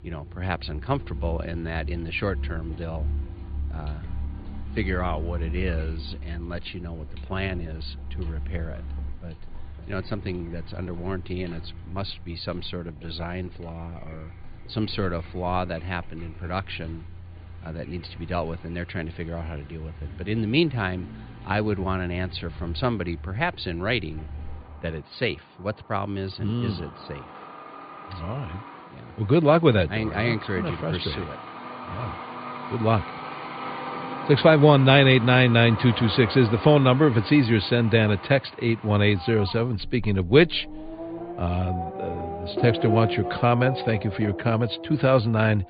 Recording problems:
high frequencies cut off; severe; nothing above 4.5 kHz
traffic noise; noticeable; throughout; 10 dB below the speech

